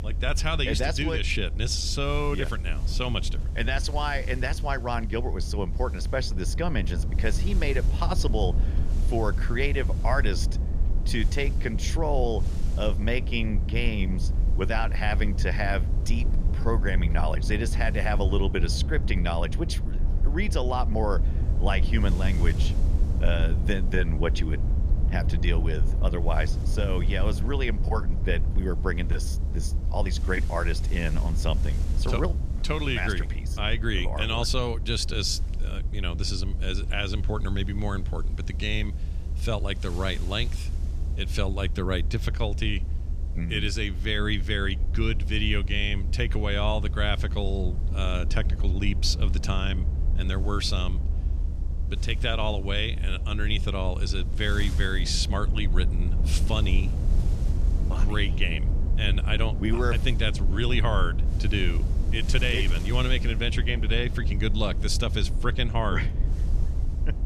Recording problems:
wind noise on the microphone; occasional gusts; 25 dB below the speech
low rumble; noticeable; throughout; 15 dB below the speech

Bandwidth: 14 kHz